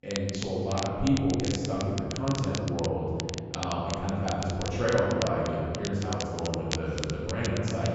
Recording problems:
room echo; strong; dies away in 2.5 s
off-mic speech; far
high frequencies cut off; noticeable; nothing above 8 kHz
crackle, like an old record; very faint; 9 dB below the speech

